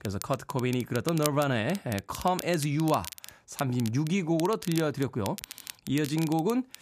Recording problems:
crackle, like an old record; noticeable; 10 dB below the speech

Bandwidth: 14.5 kHz